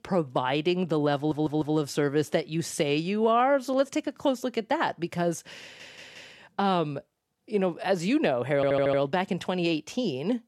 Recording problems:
audio stuttering; at 1 s, at 5.5 s and at 8.5 s

